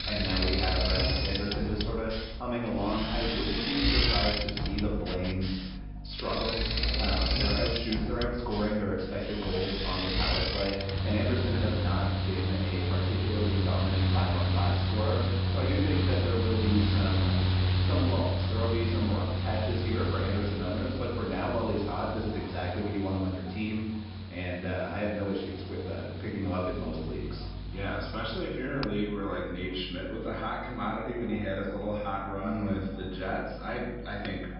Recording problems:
off-mic speech; far
room echo; noticeable; dies away in 0.7 s
high frequencies cut off; noticeable; nothing above 5.5 kHz
echo of what is said; faint; throughout; 440 ms later, 20 dB below the speech
machinery noise; very loud; throughout; 3 dB above the speech
electrical hum; faint; from 2.5 to 12 s, from 15 to 22 s and from 27 s on; 50 Hz, 25 dB below the speech

